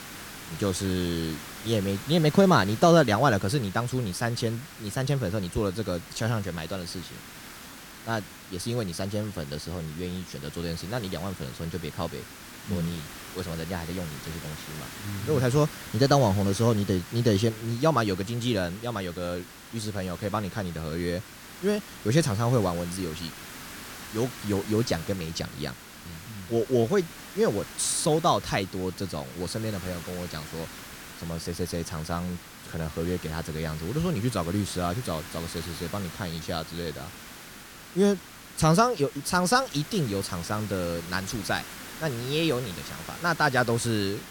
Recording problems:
hiss; noticeable; throughout; 15 dB below the speech

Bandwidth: 17.5 kHz